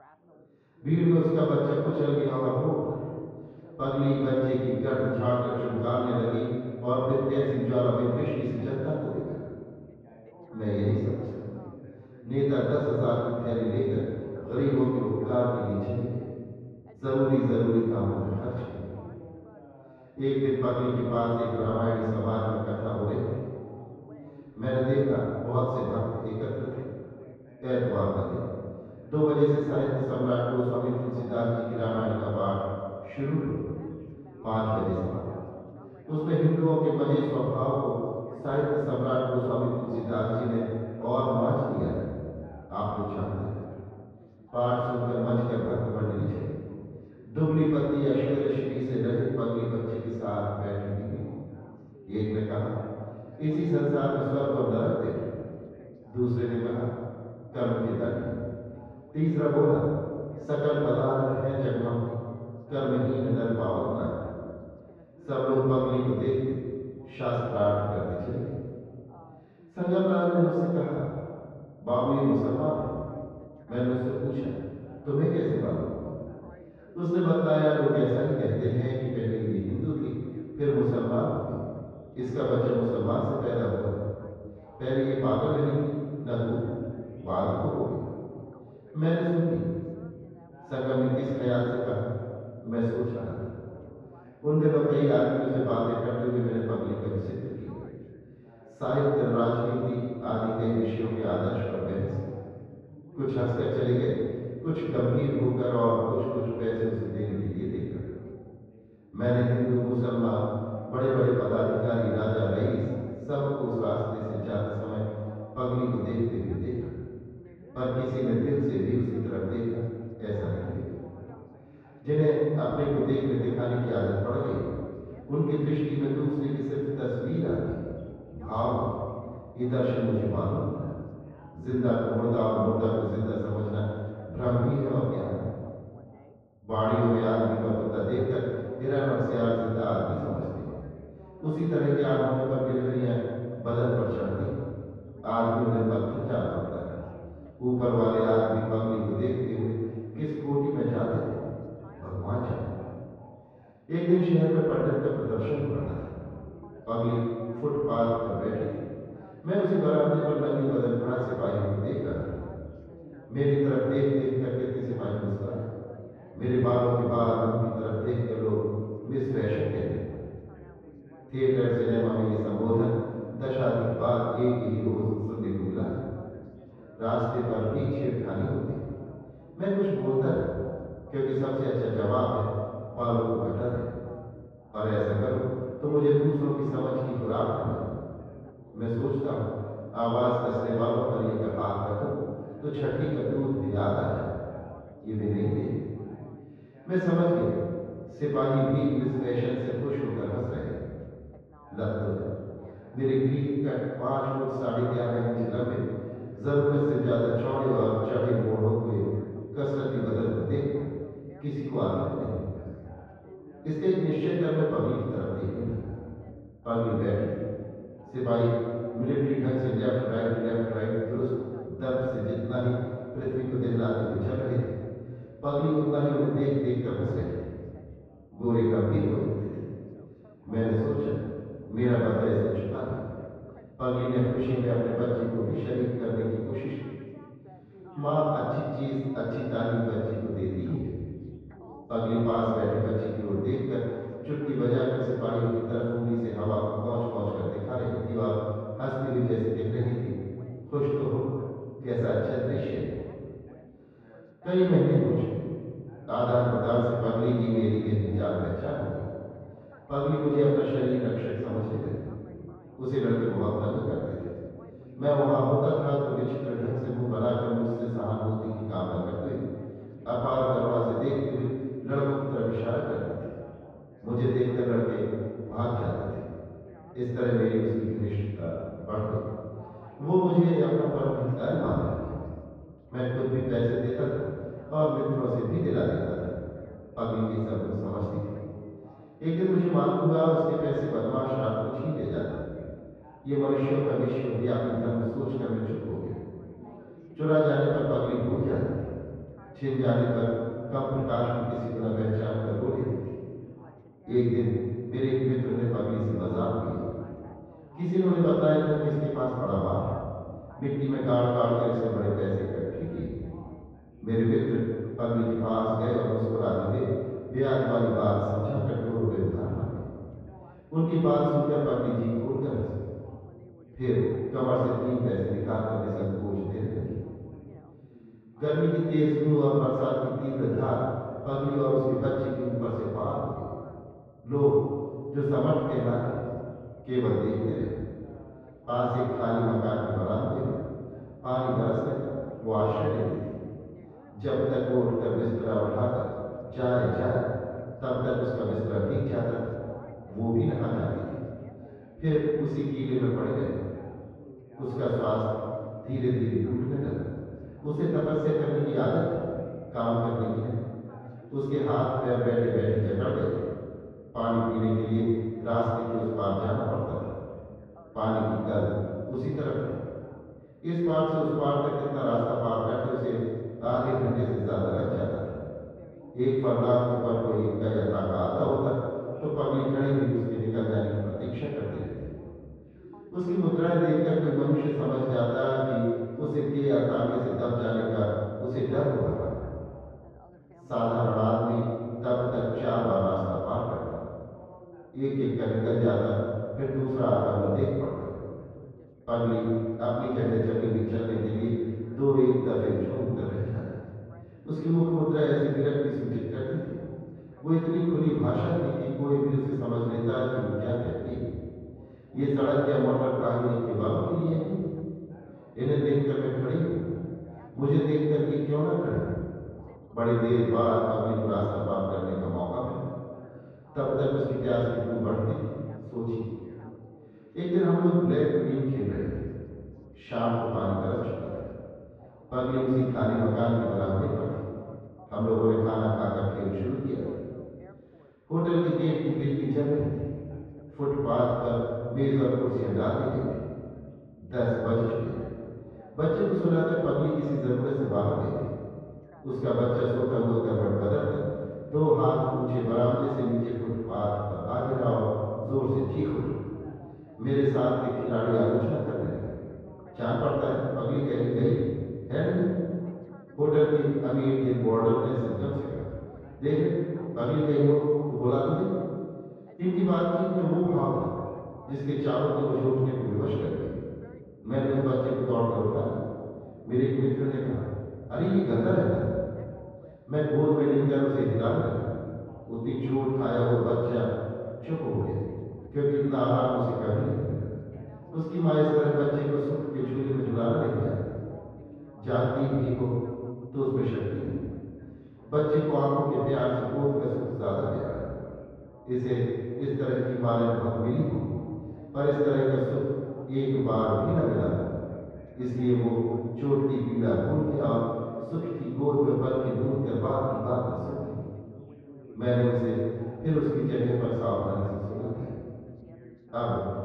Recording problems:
room echo; strong; dies away in 1.7 s
off-mic speech; far
muffled; very; fading above 1.5 kHz
echo of what is said; faint; throughout; 210 ms later, 20 dB below the speech
background chatter; faint; throughout; 2 voices, 25 dB below the speech

